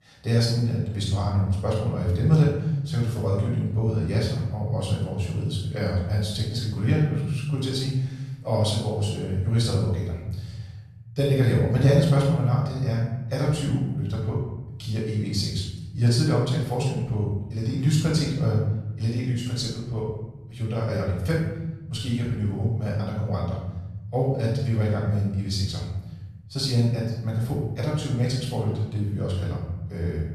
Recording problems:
off-mic speech; far
room echo; noticeable; dies away in 1.4 s

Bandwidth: 13.5 kHz